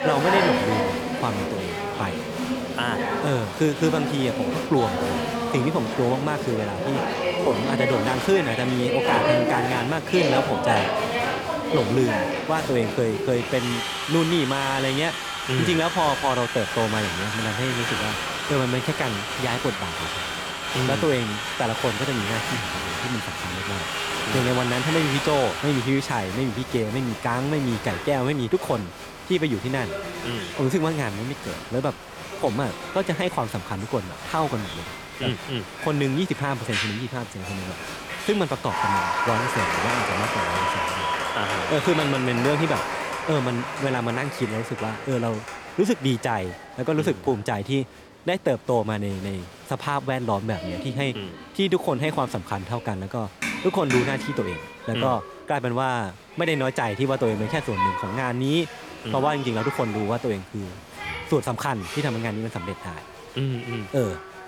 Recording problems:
crowd noise; loud; throughout; 2 dB below the speech

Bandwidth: 18 kHz